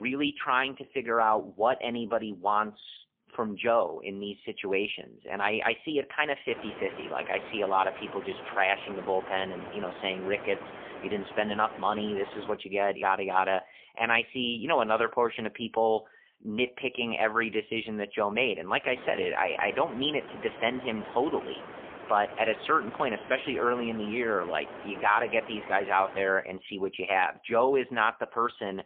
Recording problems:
phone-call audio; poor line; nothing above 3.5 kHz
wind noise on the microphone; occasional gusts; from 6.5 to 13 s and from 19 to 26 s; 15 dB below the speech
abrupt cut into speech; at the start

